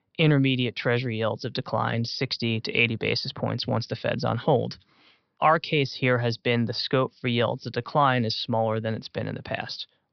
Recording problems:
high frequencies cut off; noticeable; nothing above 5.5 kHz

